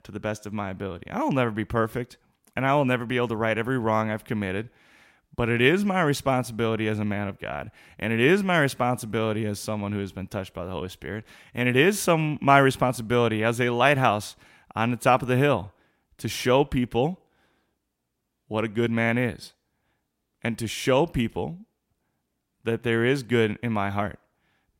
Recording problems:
none

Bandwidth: 16 kHz